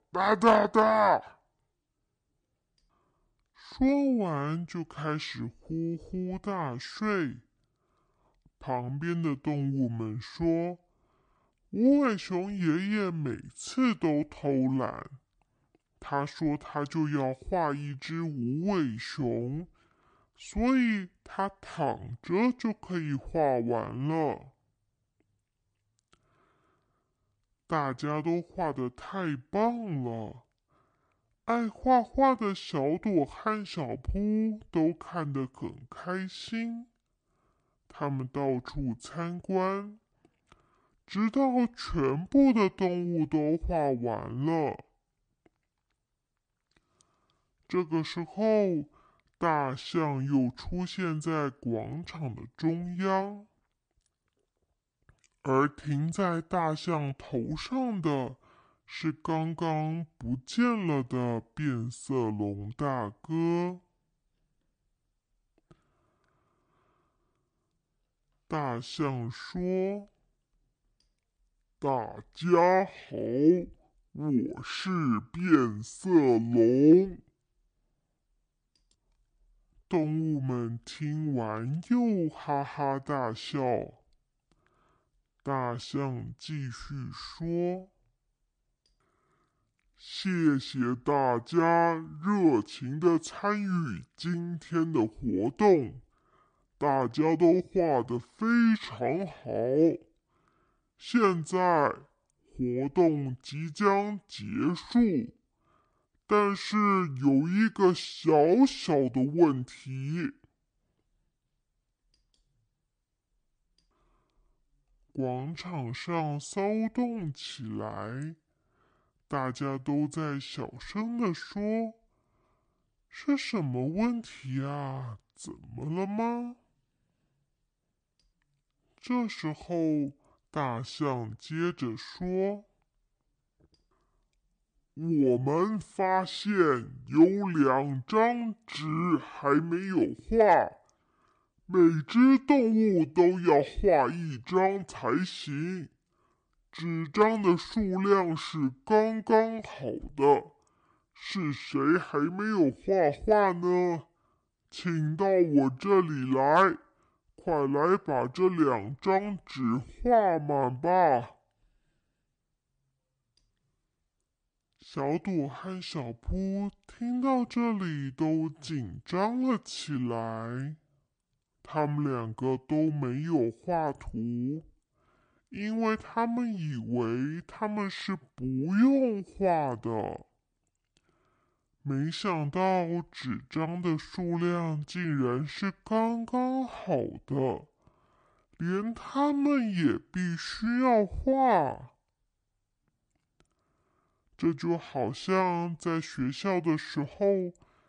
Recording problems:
wrong speed and pitch; too slow and too low; 0.6 times normal speed

